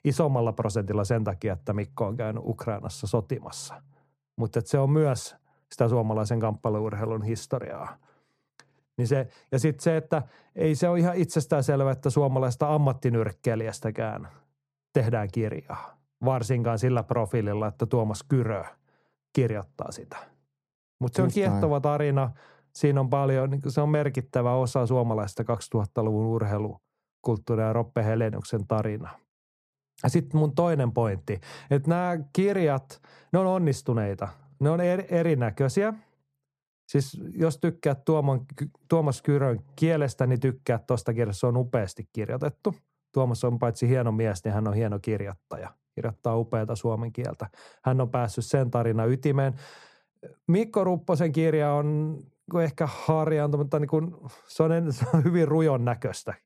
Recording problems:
muffled; slightly; fading above 1.5 kHz

